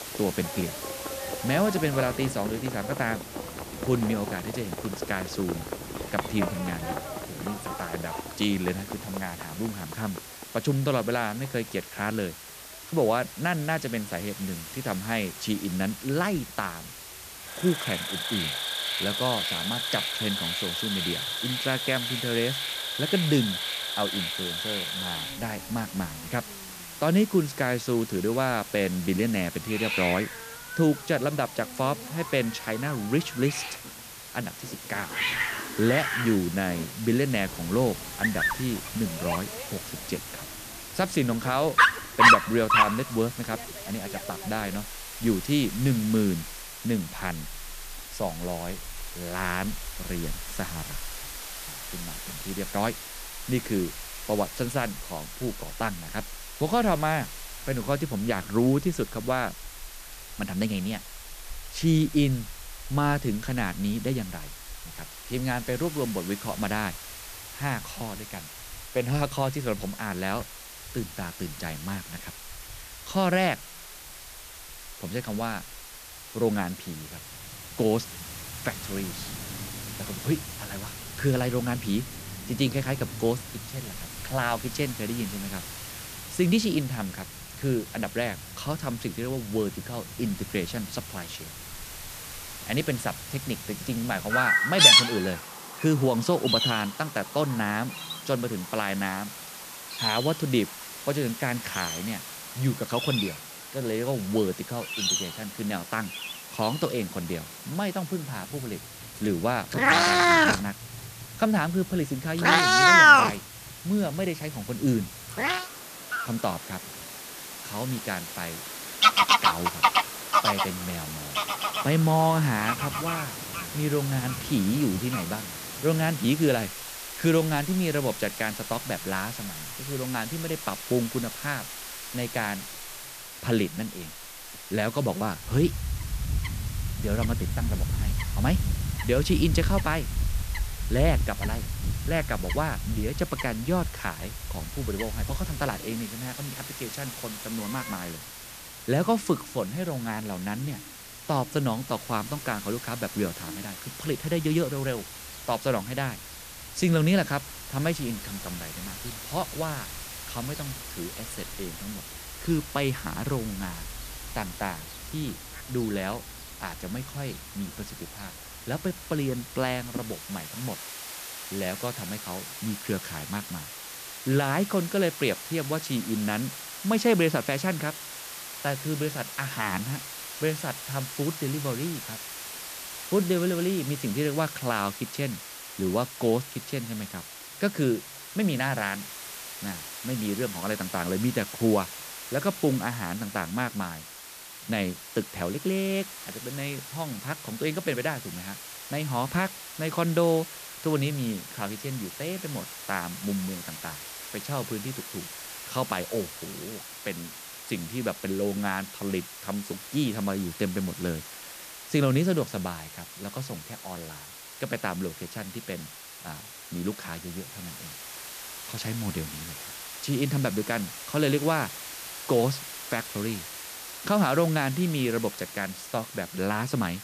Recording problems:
animal sounds; very loud; until 2:50; 4 dB above the speech
hiss; loud; throughout; 9 dB below the speech

